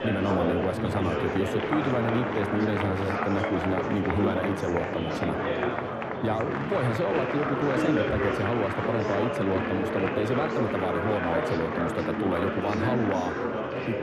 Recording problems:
muffled; slightly; fading above 2.5 kHz
murmuring crowd; very loud; throughout; 1 dB above the speech

